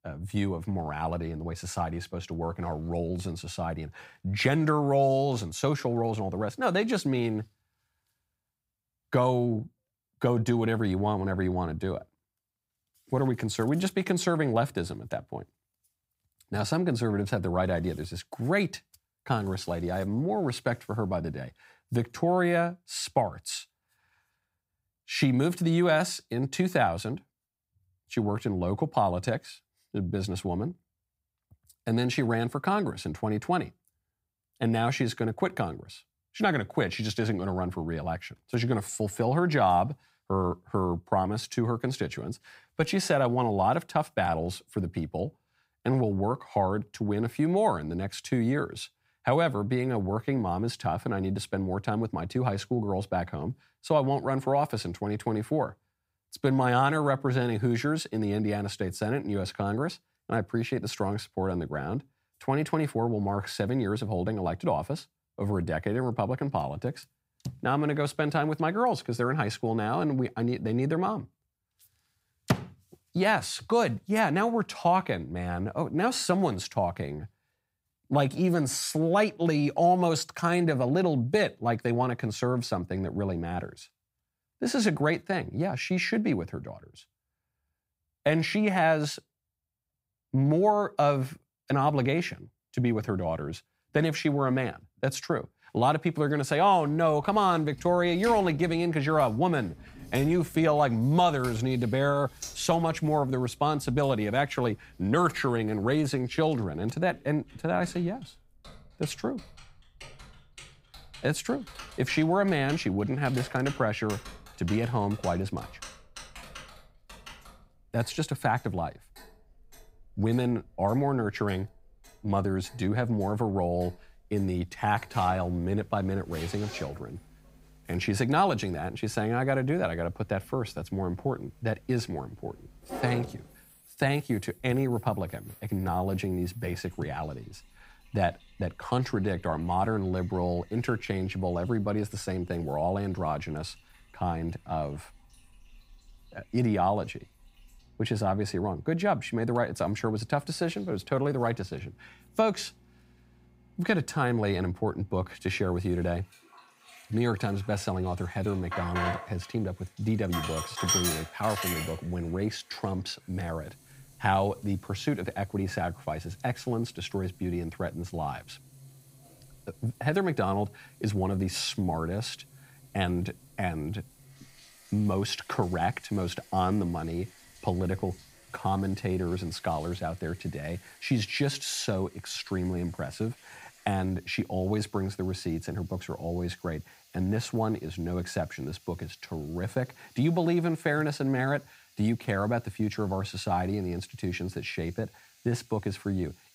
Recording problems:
household noises; noticeable; from 1:37 on; 15 dB below the speech

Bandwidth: 15.5 kHz